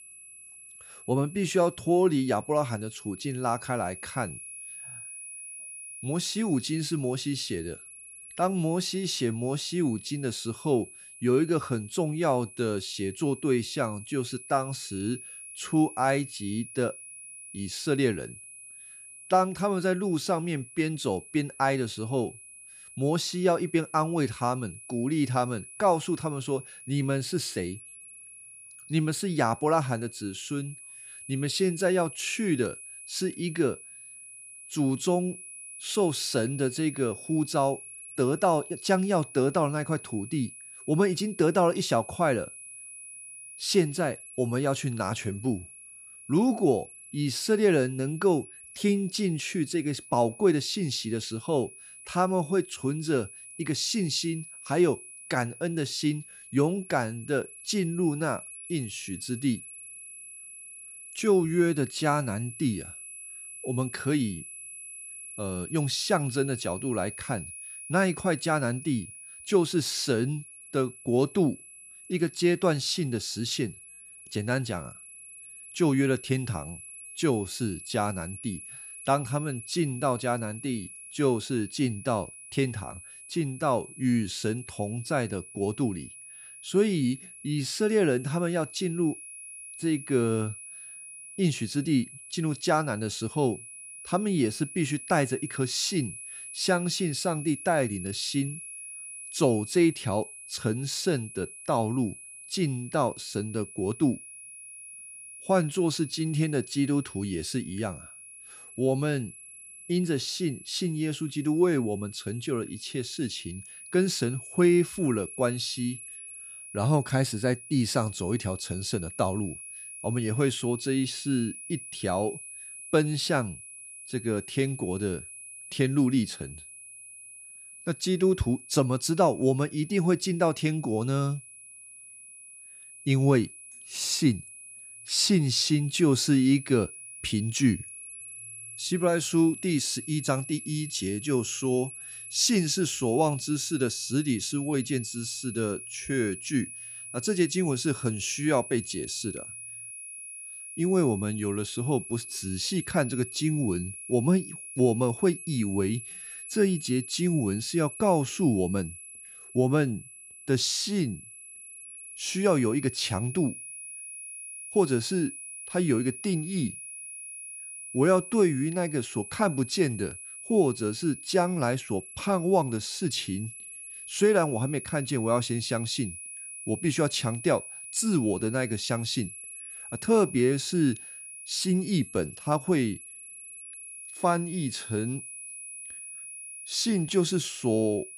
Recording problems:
high-pitched whine; noticeable; throughout; 10.5 kHz, 15 dB below the speech

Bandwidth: 15 kHz